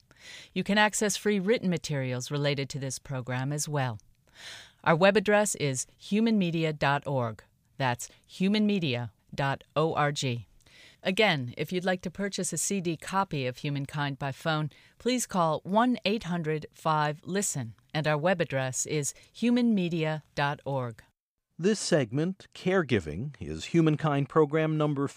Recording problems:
none

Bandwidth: 15 kHz